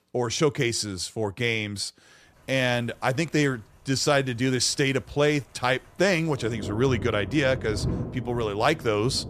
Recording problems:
rain or running water; loud; from 2.5 s on; 10 dB below the speech

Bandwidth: 14.5 kHz